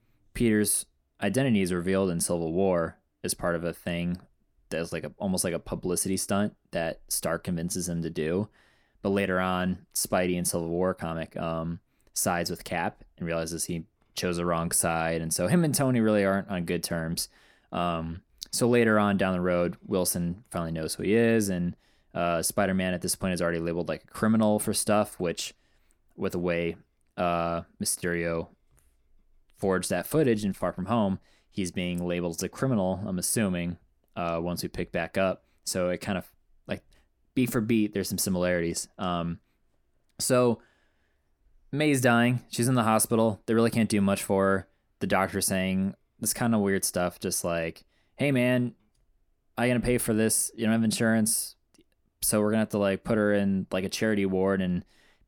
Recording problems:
none

